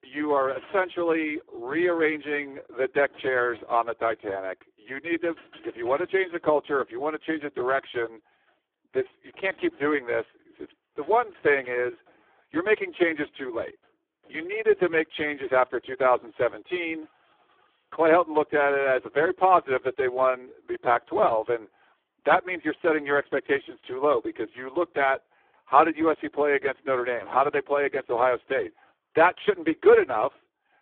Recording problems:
phone-call audio; poor line
traffic noise; faint; throughout; 30 dB below the speech

